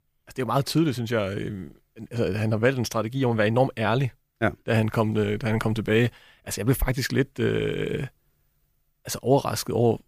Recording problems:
none

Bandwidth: 15 kHz